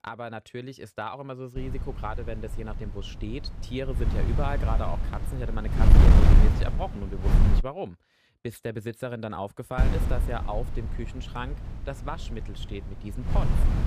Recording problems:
wind noise on the microphone; heavy; from 1.5 to 7.5 s and from 10 s on; 1 dB below the speech

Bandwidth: 15 kHz